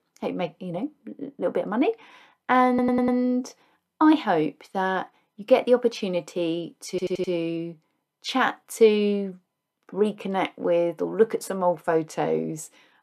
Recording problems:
audio stuttering; at 2.5 s and at 7 s

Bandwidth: 14 kHz